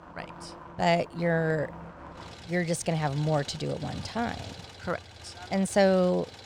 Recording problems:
traffic noise; noticeable; throughout; 15 dB below the speech

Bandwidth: 17.5 kHz